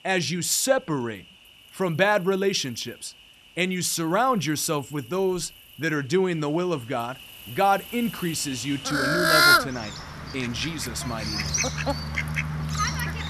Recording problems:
animal sounds; very loud; throughout; 1 dB above the speech

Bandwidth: 13.5 kHz